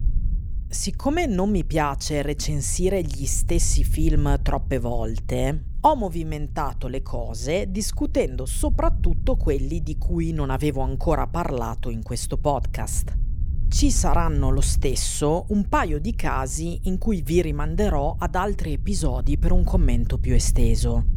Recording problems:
low rumble; faint; throughout; 20 dB below the speech

